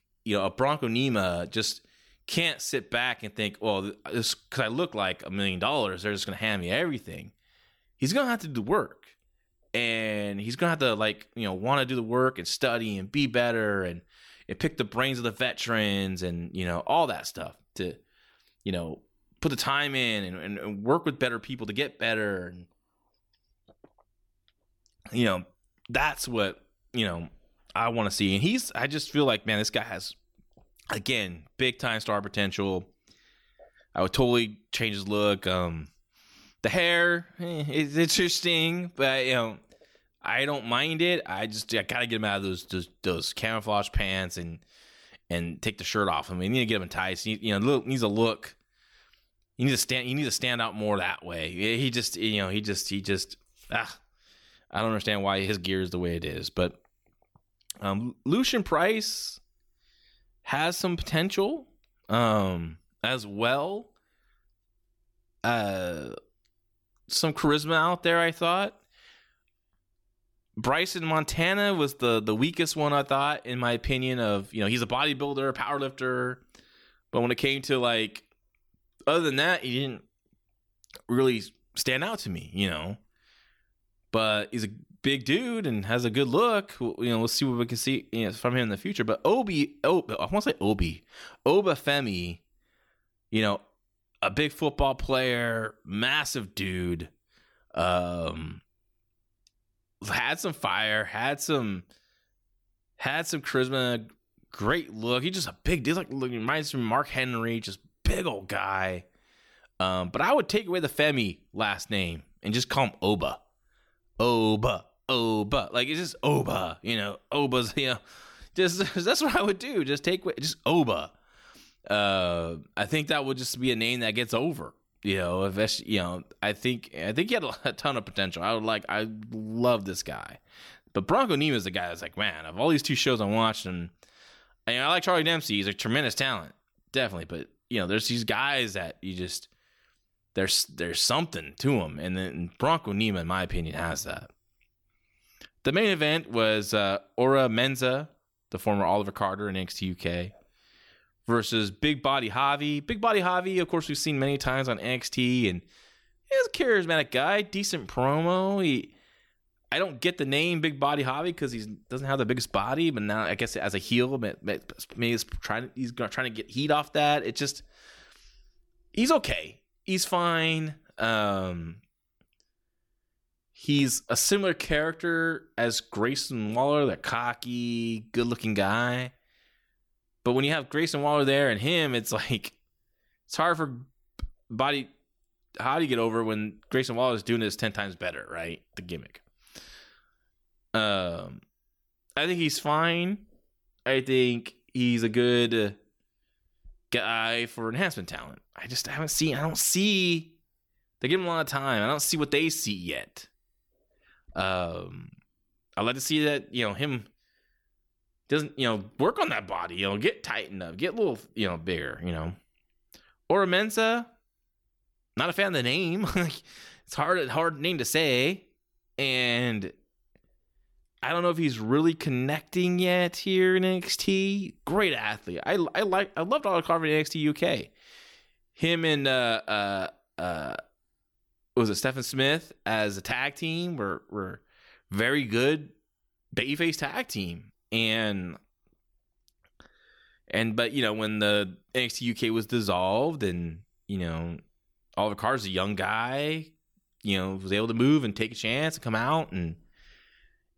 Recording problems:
none

